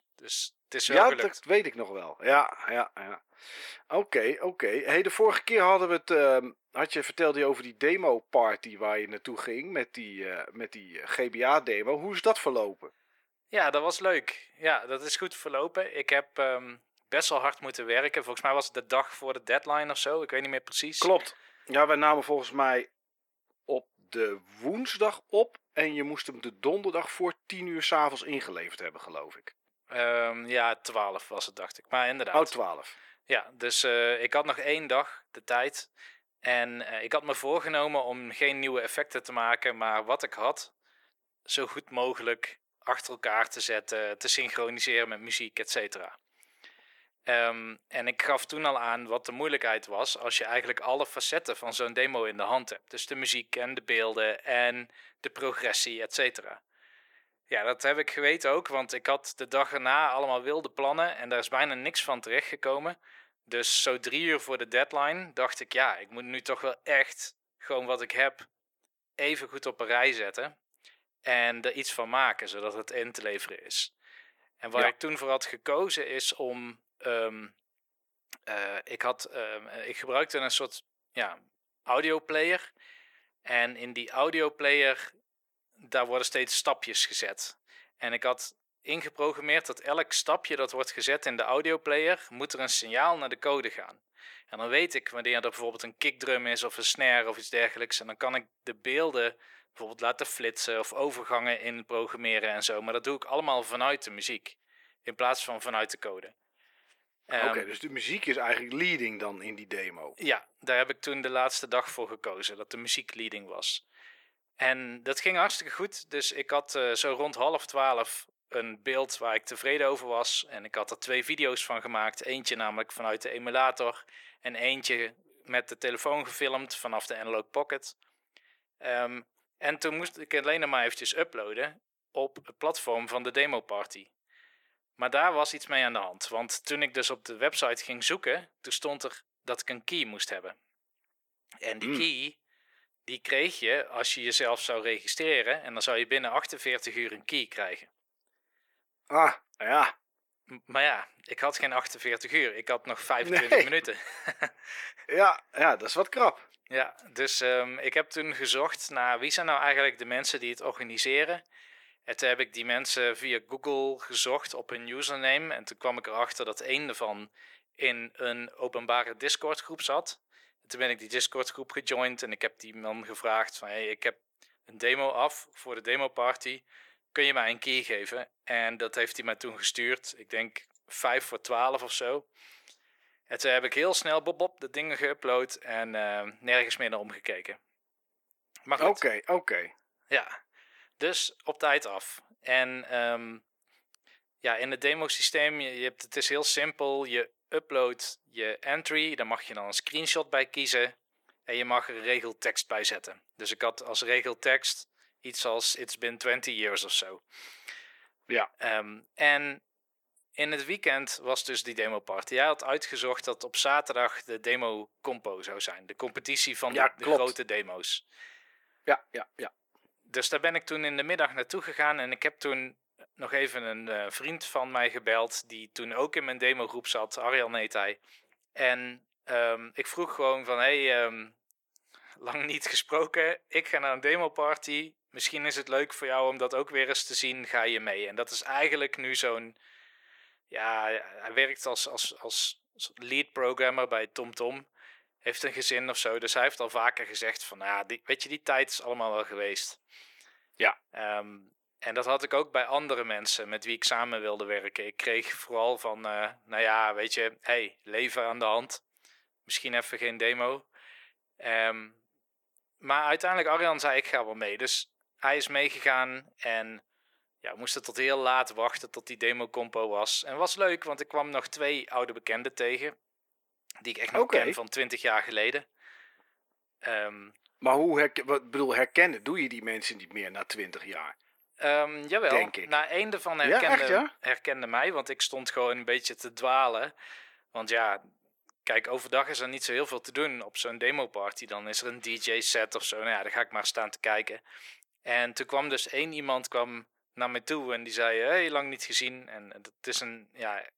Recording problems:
thin; very; fading below 400 Hz

